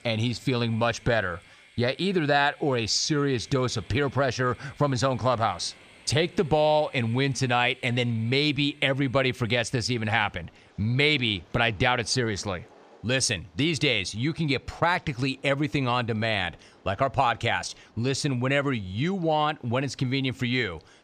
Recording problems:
train or aircraft noise; faint; throughout; 30 dB below the speech

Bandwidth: 15 kHz